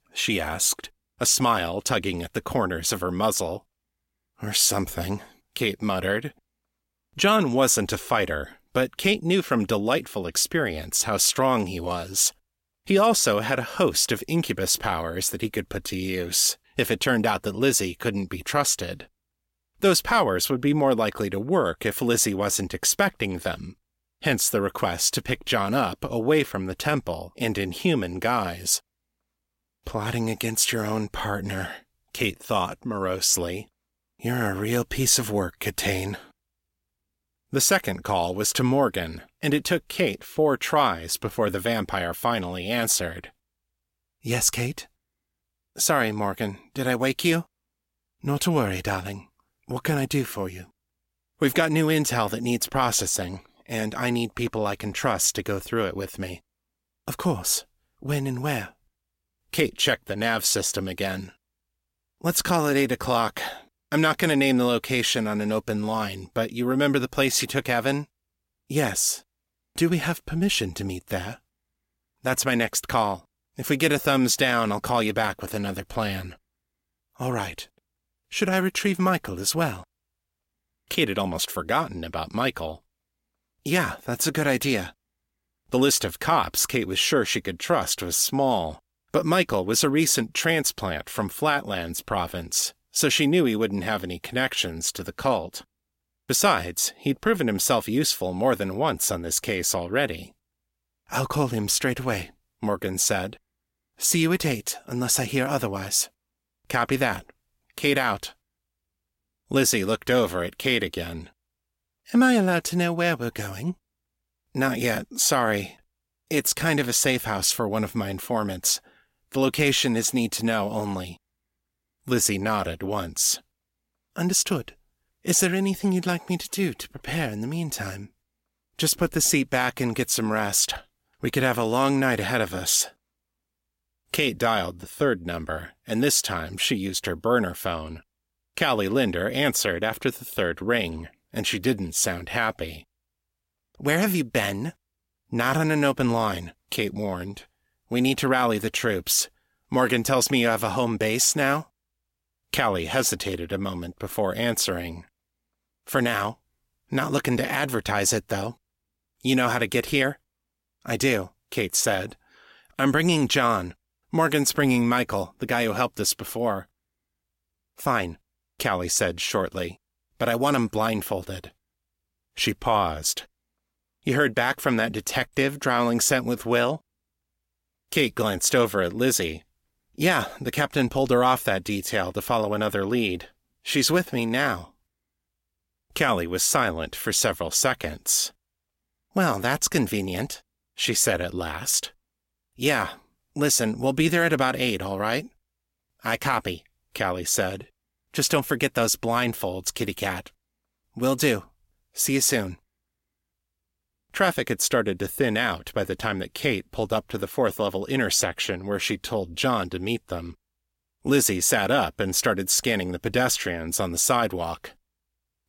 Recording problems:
none

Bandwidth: 16.5 kHz